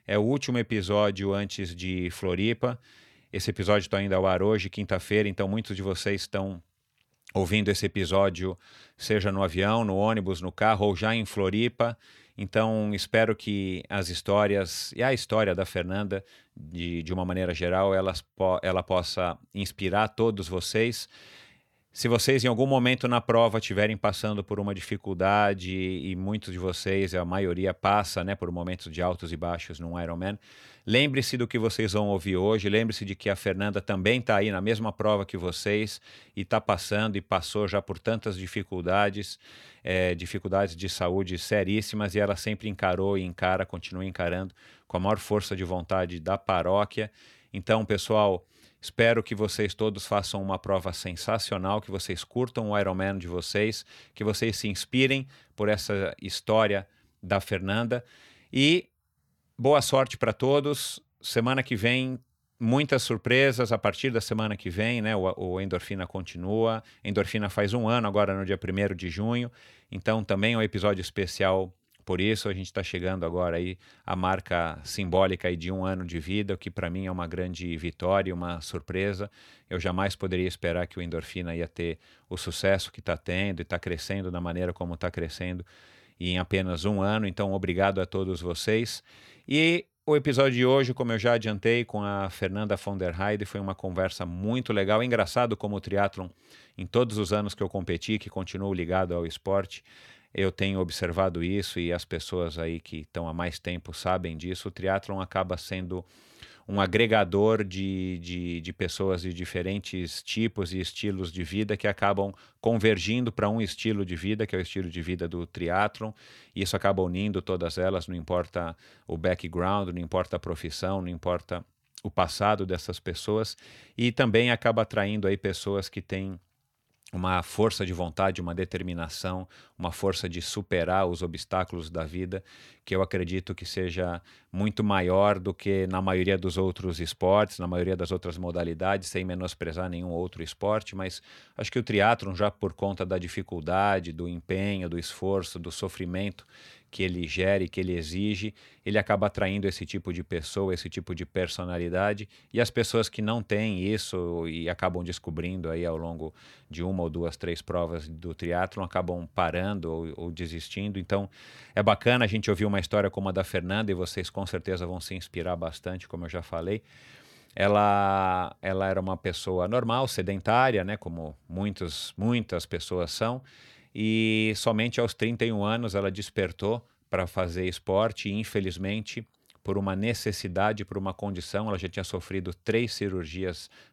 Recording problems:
none

